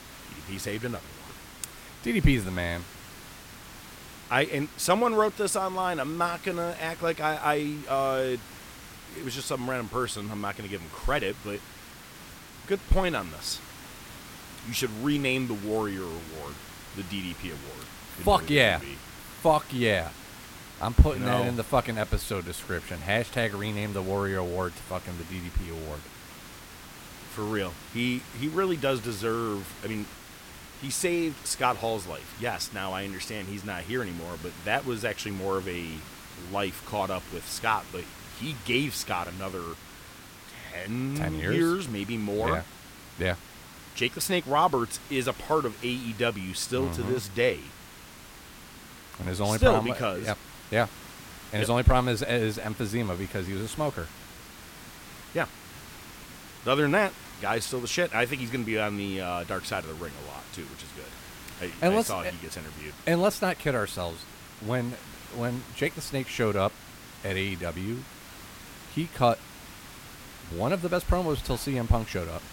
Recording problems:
hiss; noticeable; throughout; 15 dB below the speech

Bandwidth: 16.5 kHz